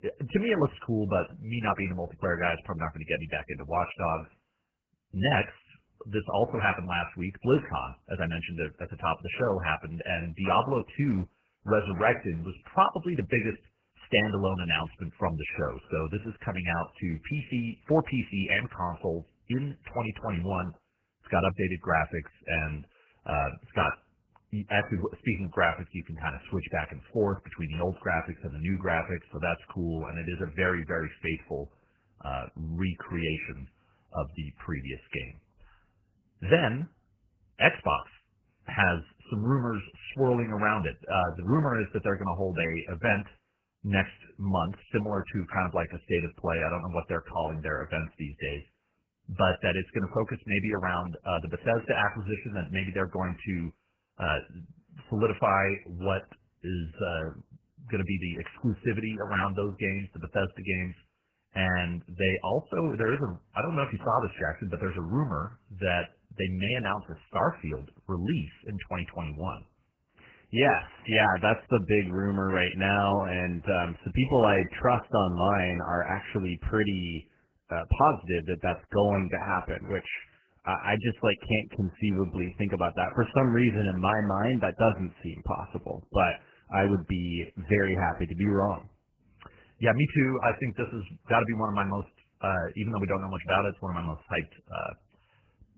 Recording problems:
garbled, watery; badly; nothing above 3 kHz

